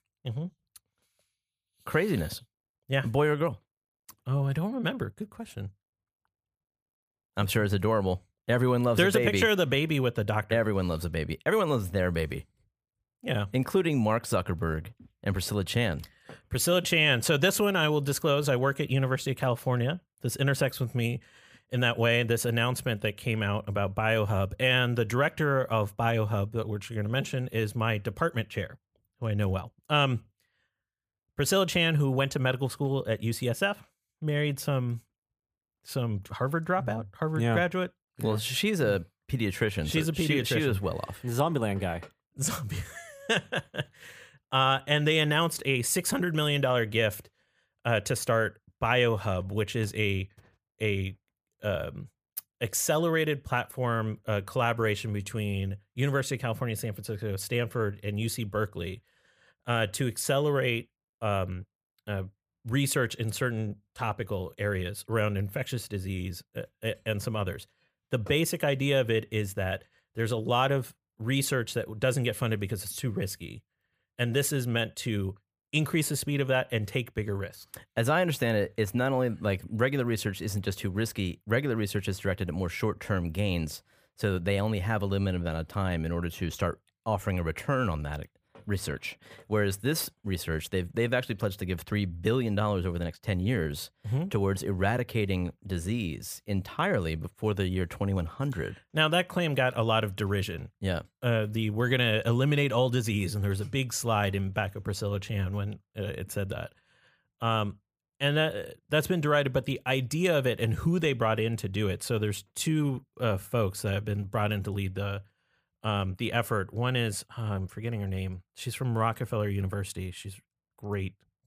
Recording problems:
none

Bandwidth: 15 kHz